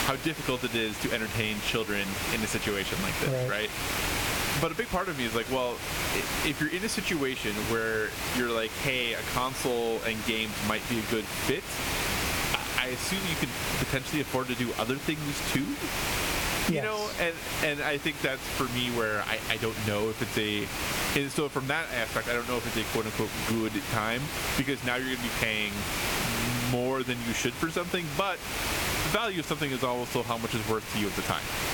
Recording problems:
squashed, flat; somewhat
hiss; loud; throughout; 2 dB below the speech

